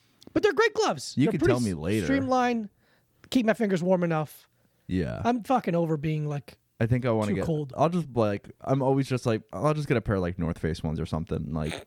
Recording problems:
none

